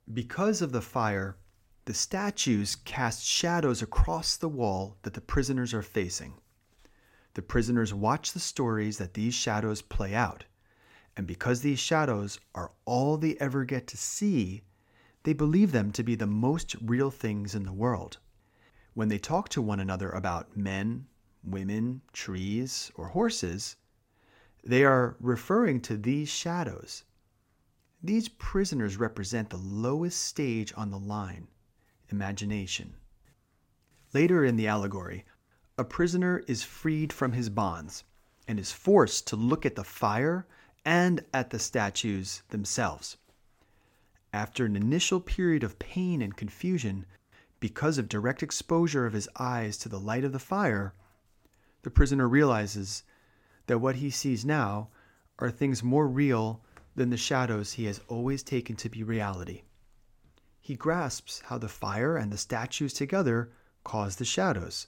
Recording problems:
none

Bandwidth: 16.5 kHz